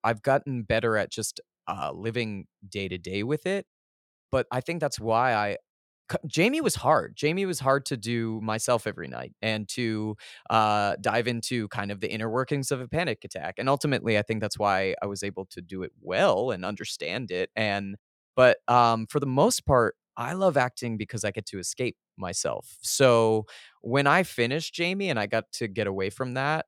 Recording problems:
none

